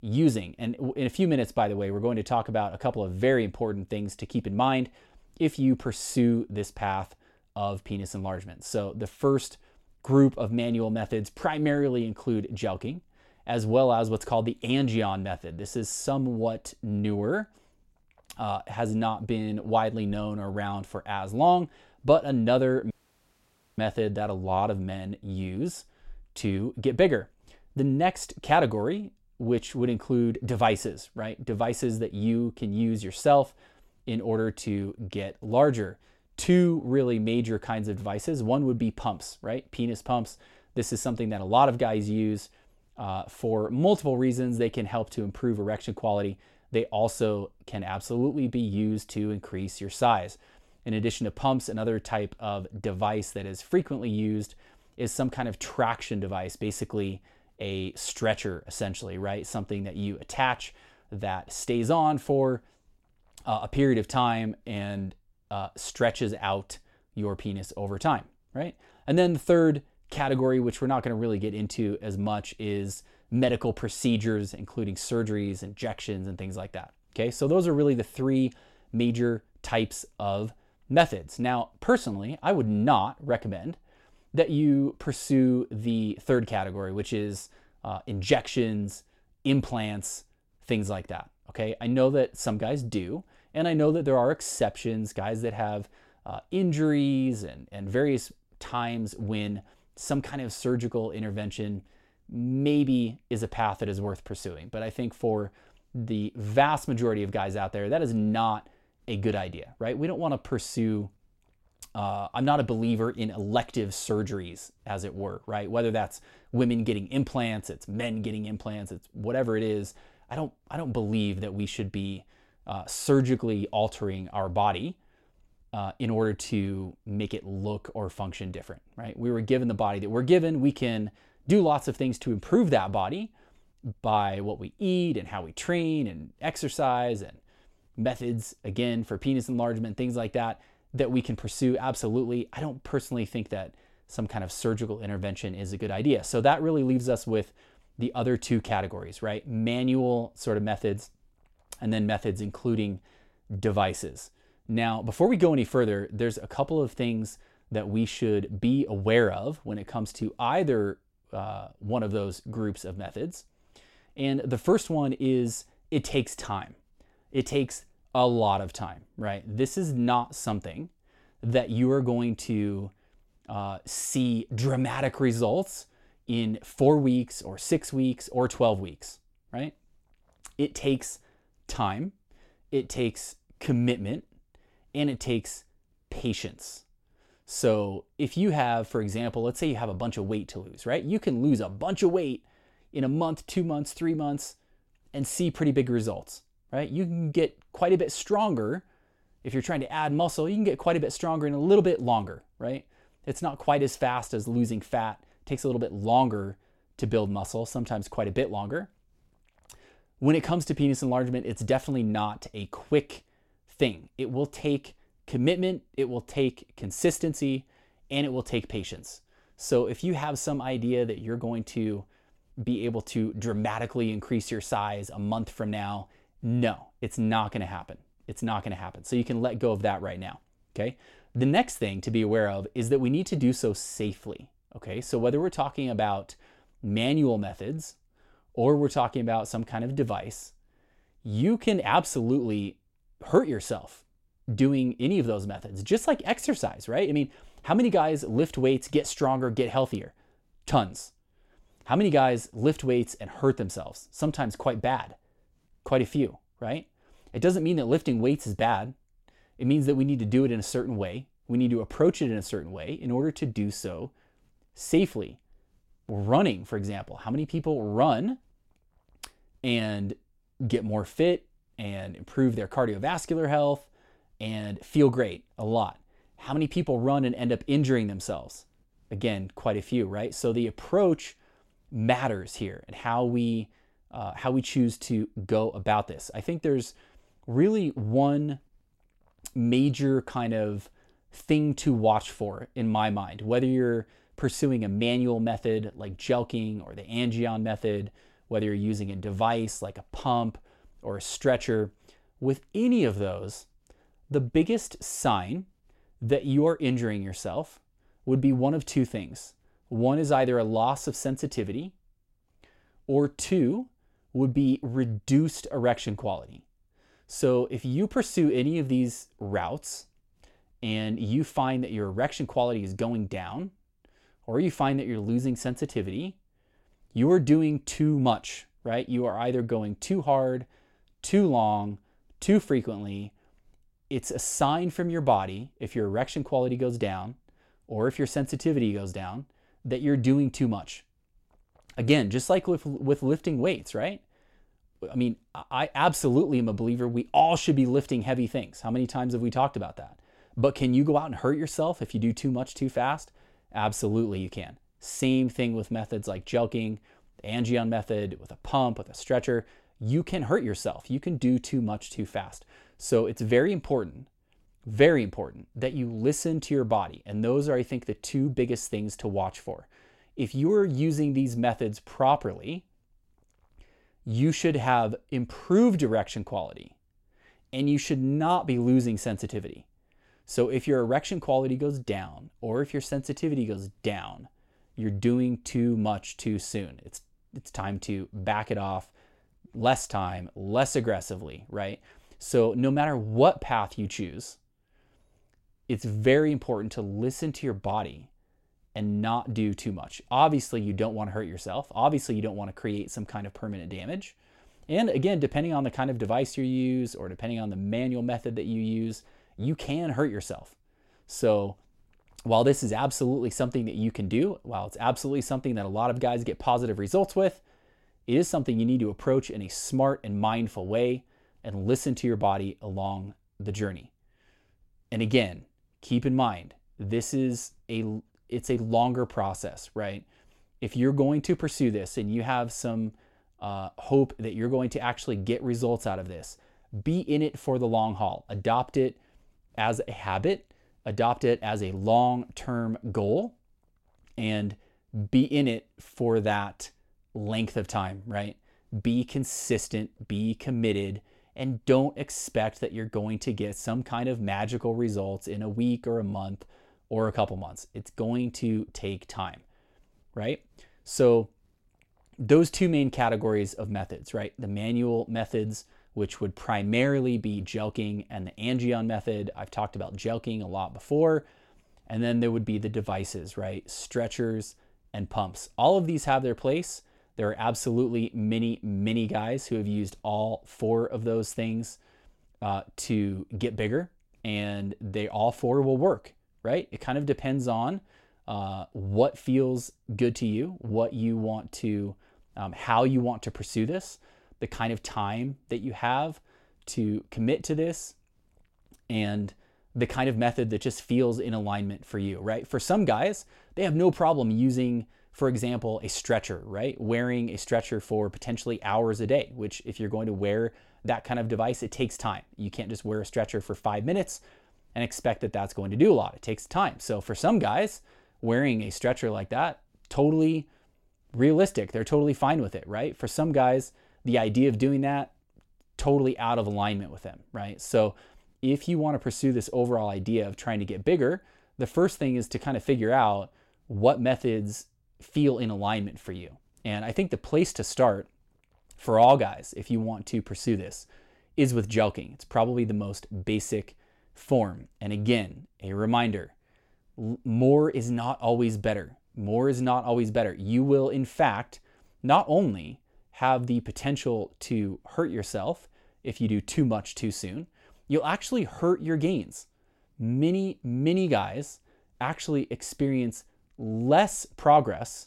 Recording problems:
audio cutting out; at 23 s for 1 s

